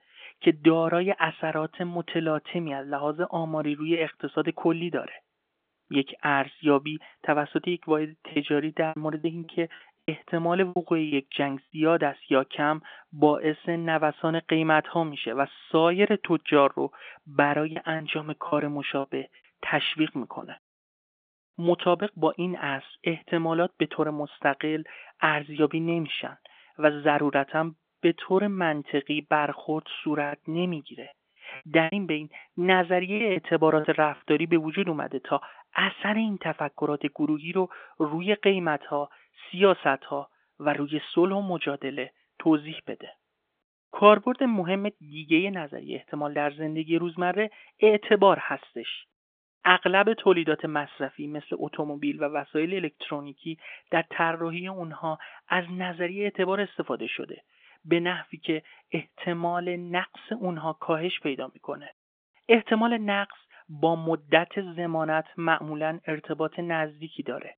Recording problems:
phone-call audio; nothing above 3.5 kHz
choppy; very; from 8.5 to 12 s, from 18 to 19 s and from 30 to 34 s; 11% of the speech affected

